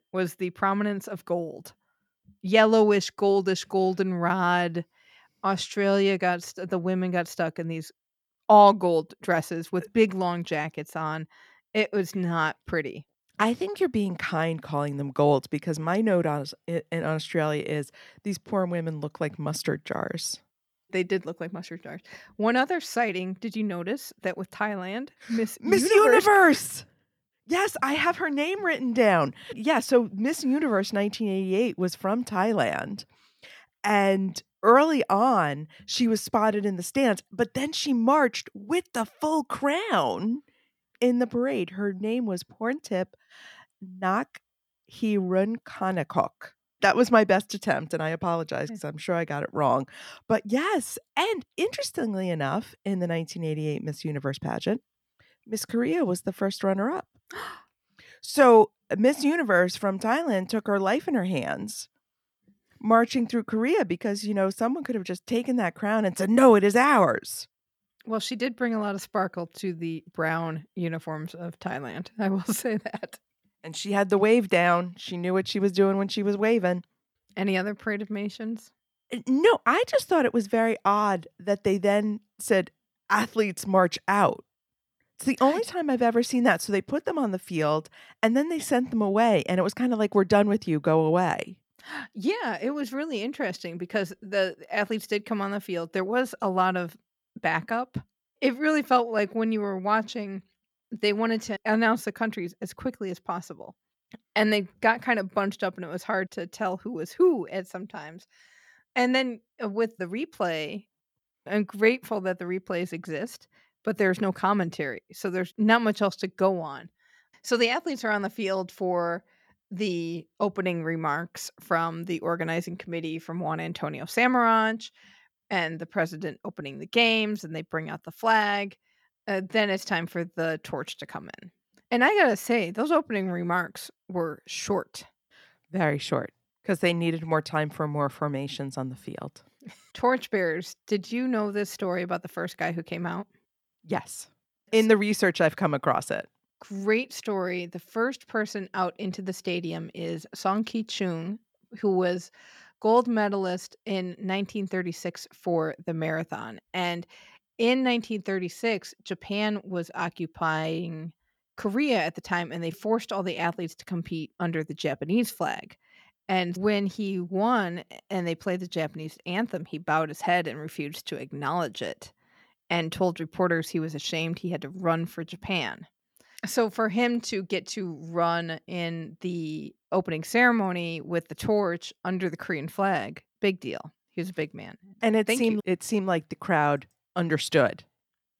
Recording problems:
none

